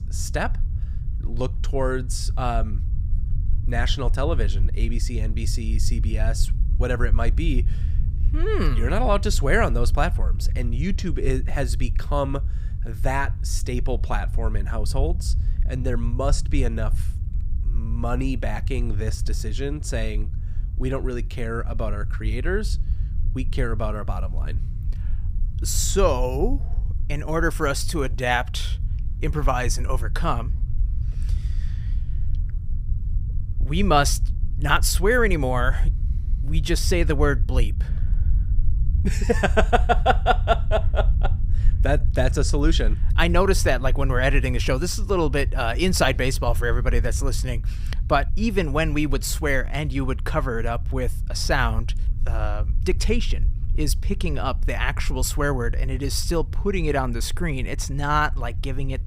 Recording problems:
low rumble; faint; throughout; 20 dB below the speech

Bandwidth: 15.5 kHz